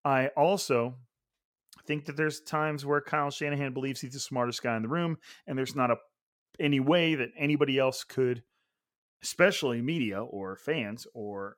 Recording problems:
none

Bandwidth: 17 kHz